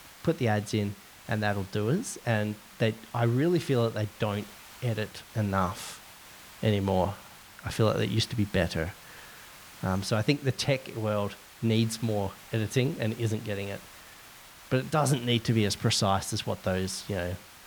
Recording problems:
hiss; noticeable; throughout; 20 dB below the speech

